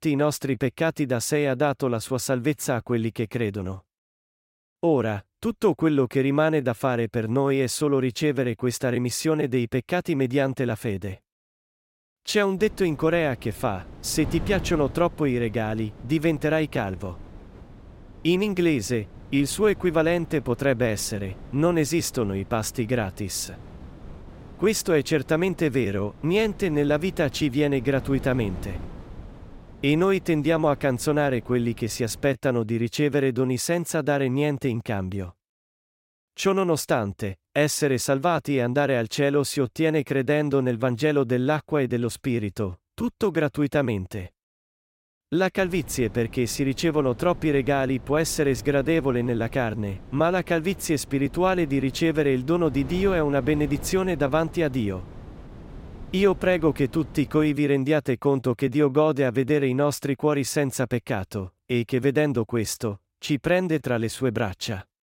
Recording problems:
wind noise on the microphone; occasional gusts; from 13 to 32 s and from 46 to 58 s; 25 dB below the speech

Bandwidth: 16 kHz